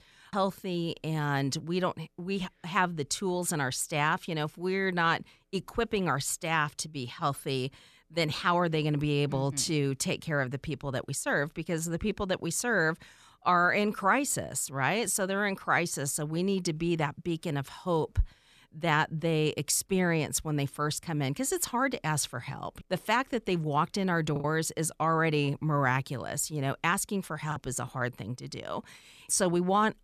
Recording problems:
choppy; occasionally; at 24 s and at 28 s; 5% of the speech affected

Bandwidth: 14 kHz